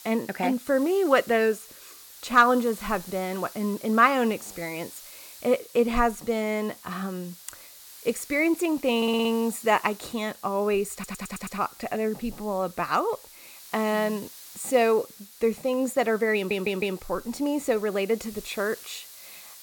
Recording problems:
hiss; noticeable; throughout; 20 dB below the speech
audio stuttering; at 9 s, at 11 s and at 16 s

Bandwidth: 17 kHz